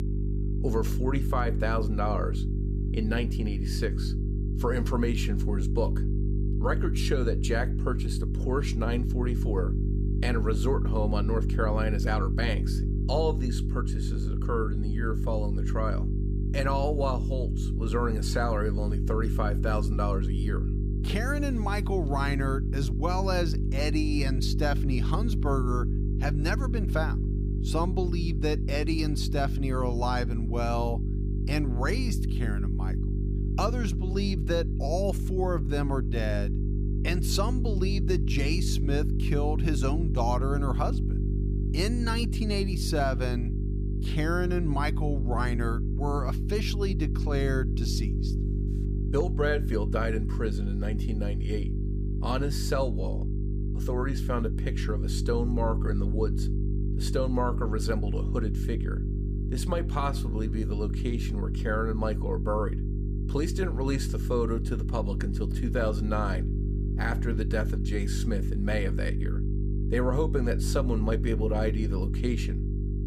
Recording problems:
electrical hum; loud; throughout; 50 Hz, 8 dB below the speech

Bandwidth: 15 kHz